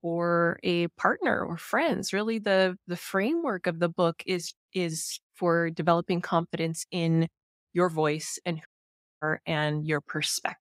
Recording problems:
audio cutting out; at 8.5 s for 0.5 s

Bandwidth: 15.5 kHz